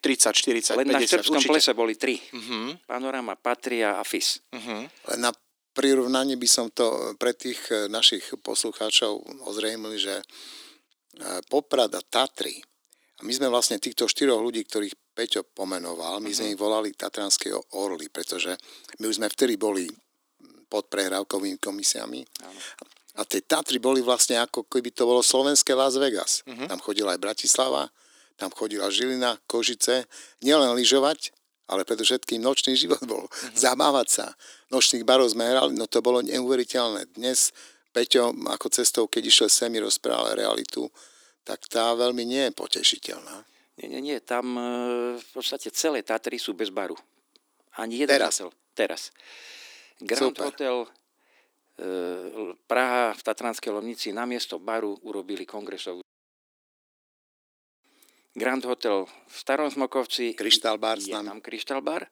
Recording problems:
thin; somewhat; fading below 300 Hz

